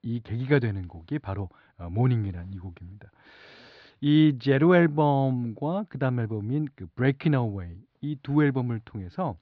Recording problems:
muffled; very slightly; fading above 4 kHz

